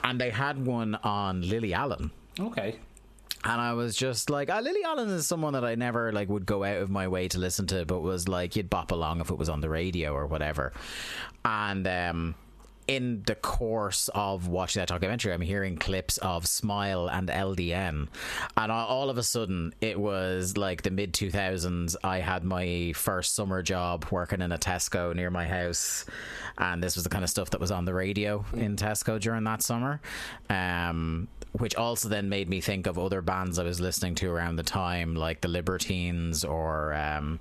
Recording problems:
squashed, flat; heavily

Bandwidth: 13.5 kHz